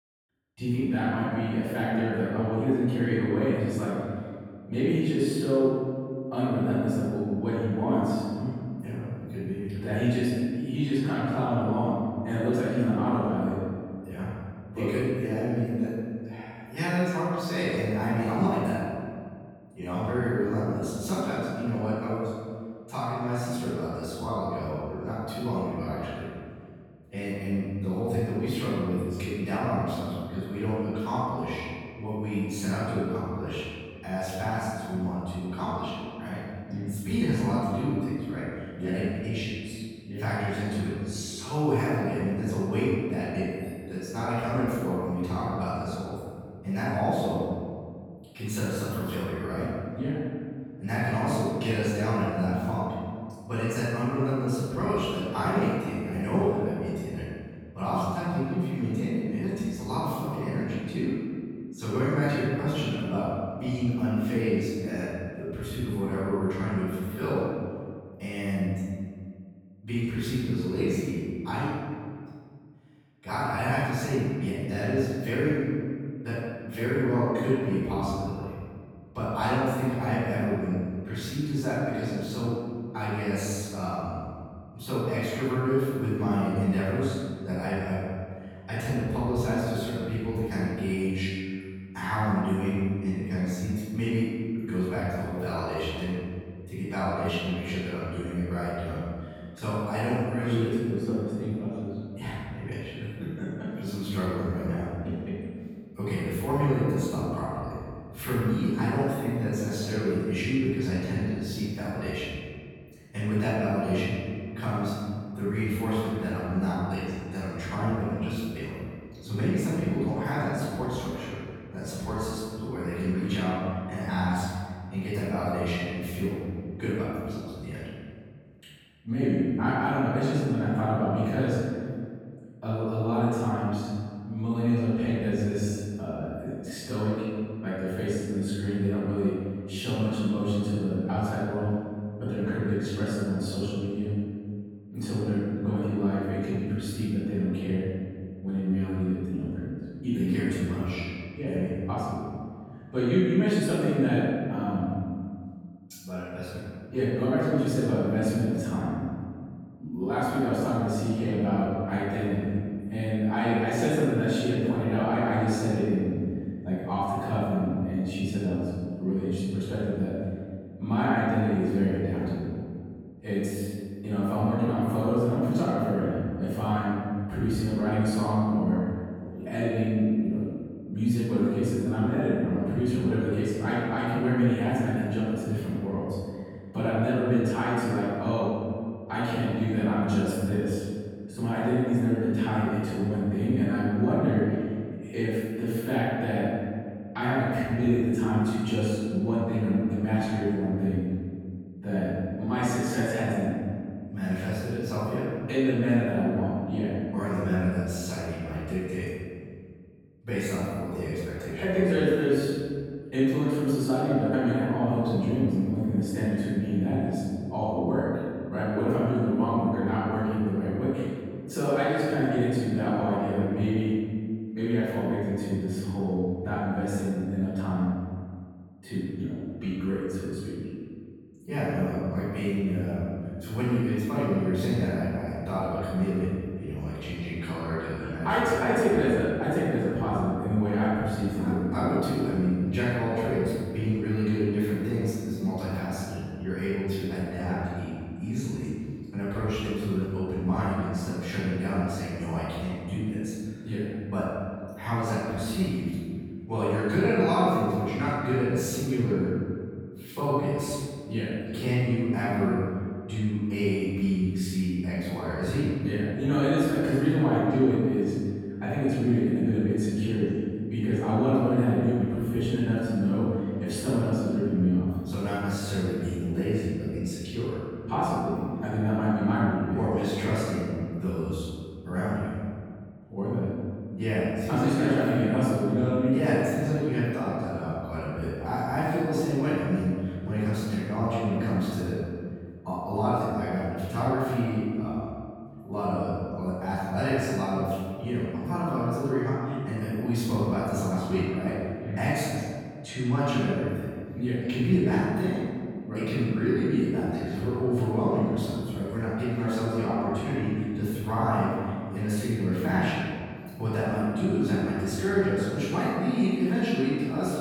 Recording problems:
room echo; strong; dies away in 1.9 s
off-mic speech; far

